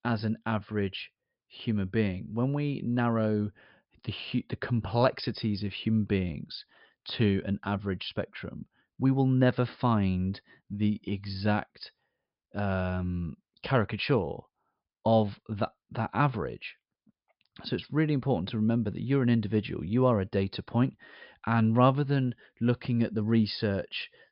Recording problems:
high frequencies cut off; noticeable; nothing above 5.5 kHz

